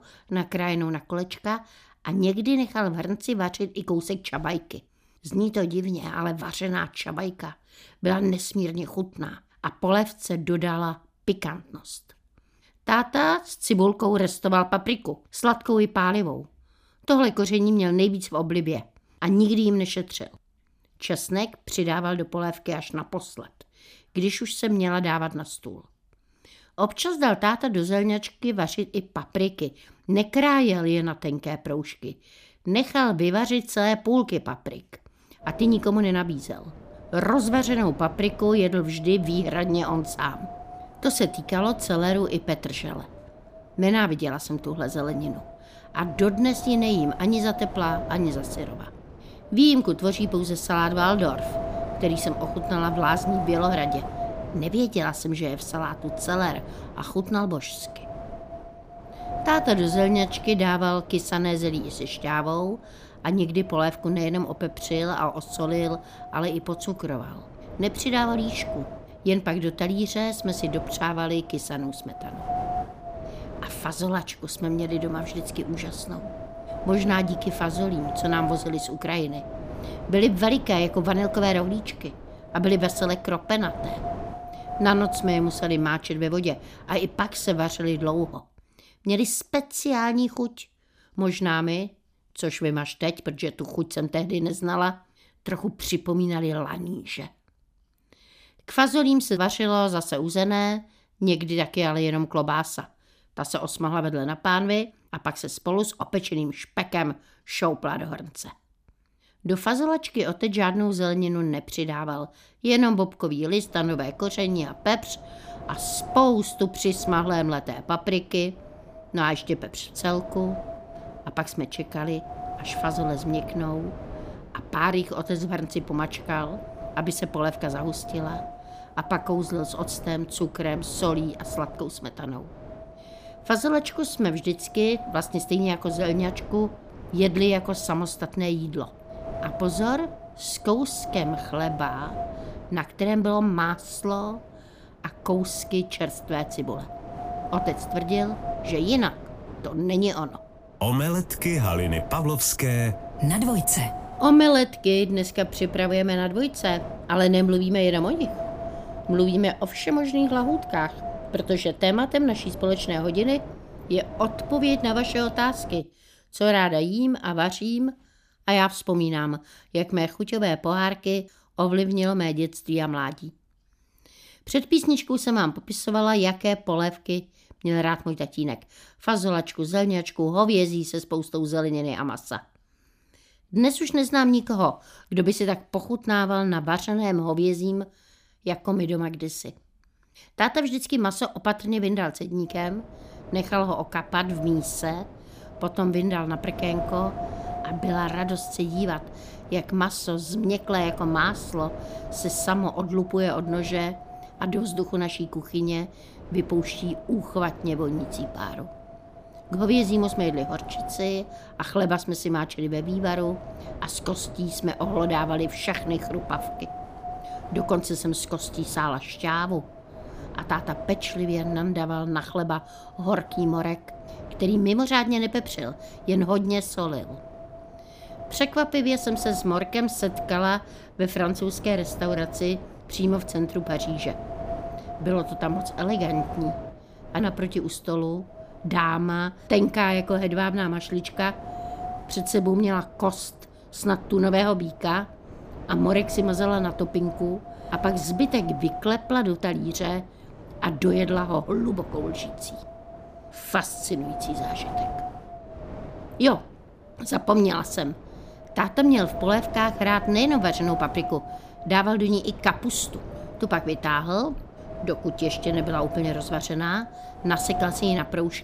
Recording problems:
wind noise on the microphone; heavy; from 35 s to 1:28, from 1:54 to 2:46 and from 3:12 on; 9 dB below the speech

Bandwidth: 15 kHz